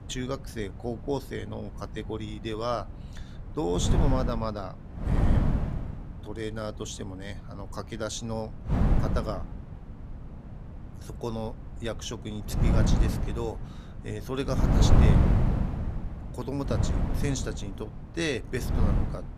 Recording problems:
wind noise on the microphone; heavy; 1 dB below the speech

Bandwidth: 14.5 kHz